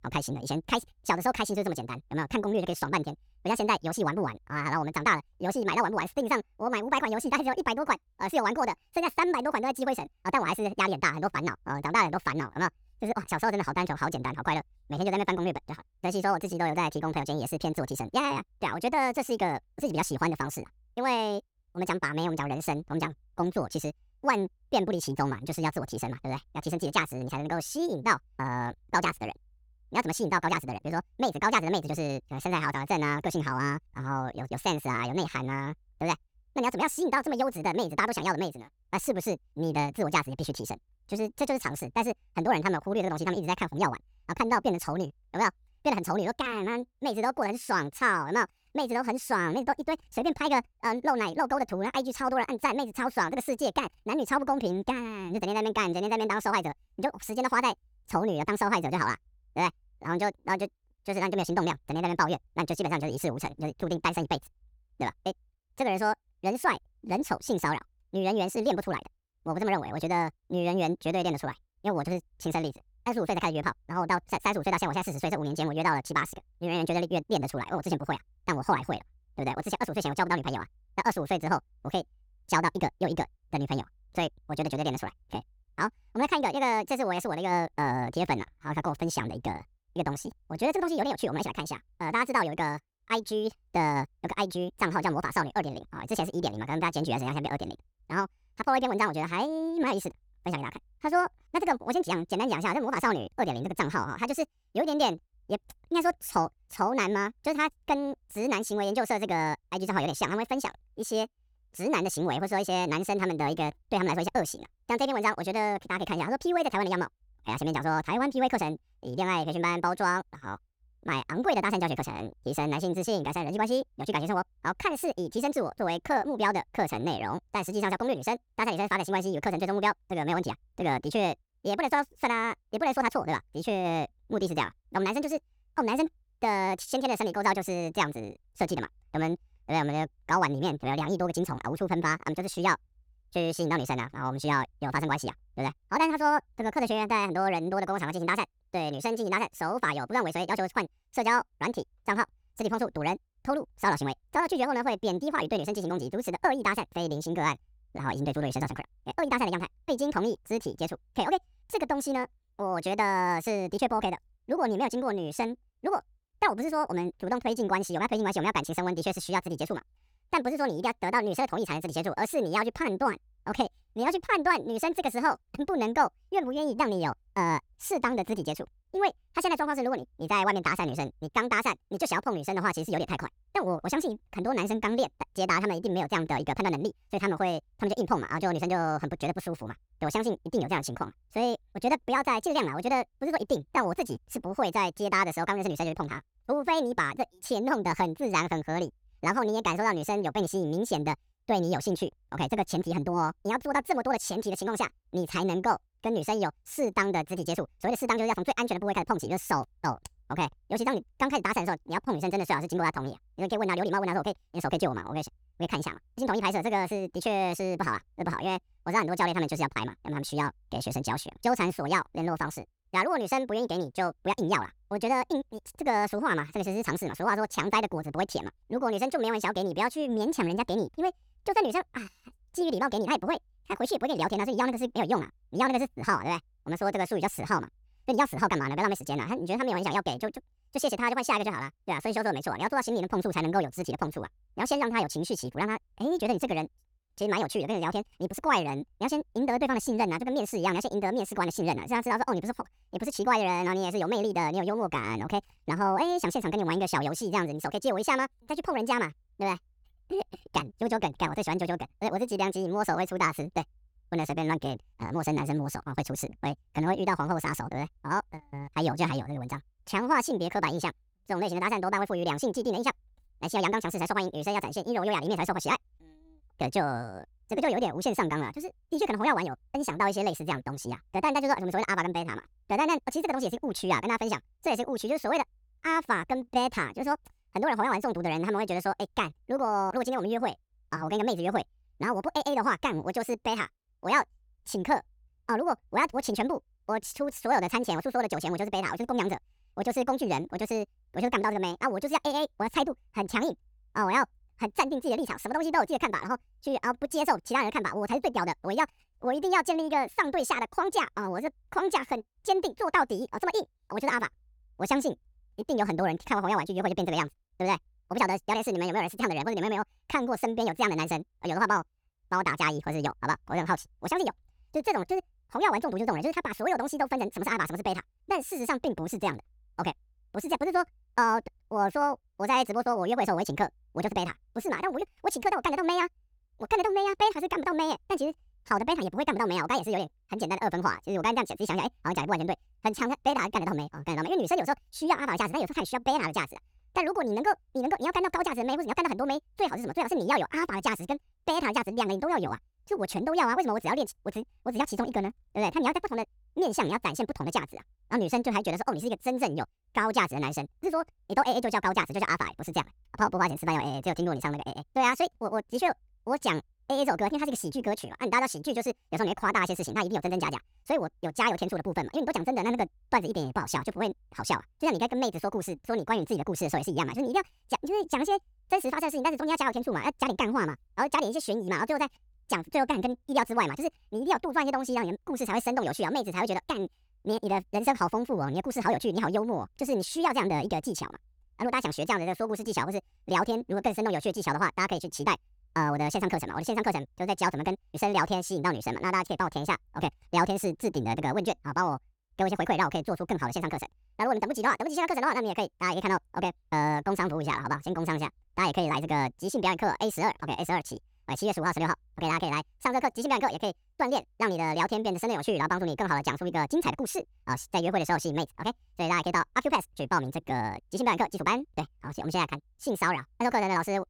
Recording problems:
wrong speed and pitch; too fast and too high; 1.7 times normal speed

